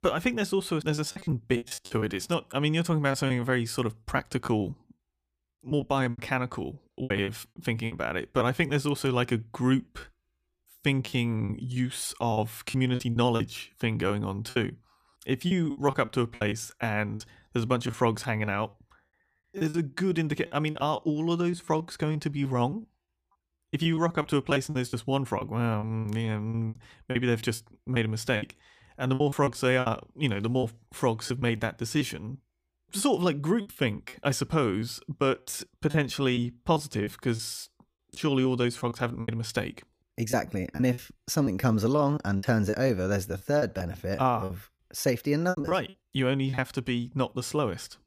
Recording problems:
choppy; very; 11% of the speech affected

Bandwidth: 15 kHz